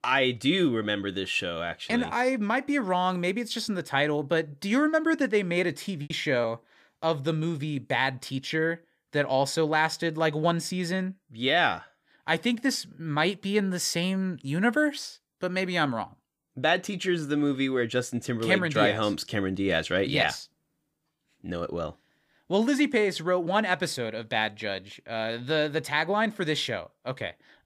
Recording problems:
choppy; very; at 6 s; 7% of the speech affected

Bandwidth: 15 kHz